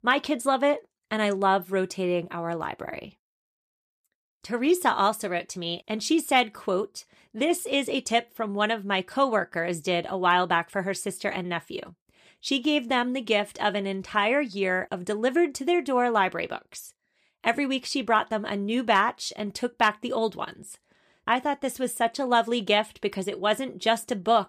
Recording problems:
none

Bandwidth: 14.5 kHz